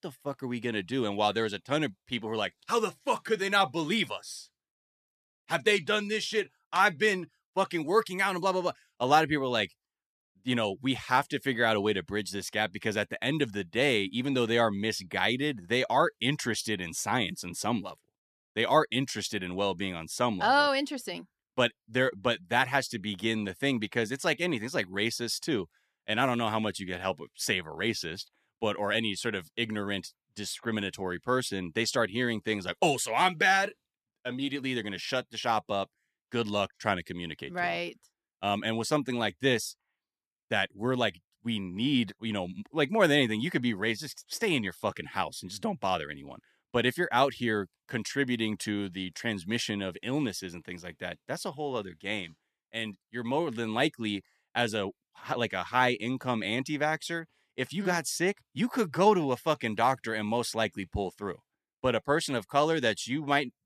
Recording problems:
none

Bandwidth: 14 kHz